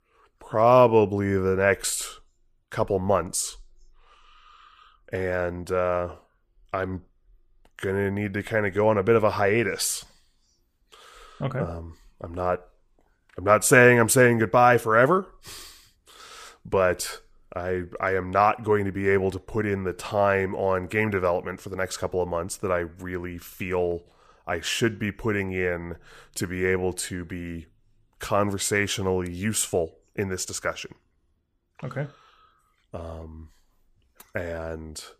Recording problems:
none

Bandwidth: 14.5 kHz